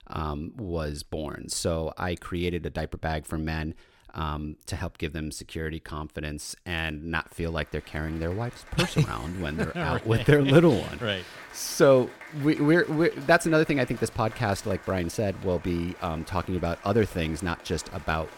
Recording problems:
crowd noise; noticeable; from 8 s on; 20 dB below the speech

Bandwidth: 17 kHz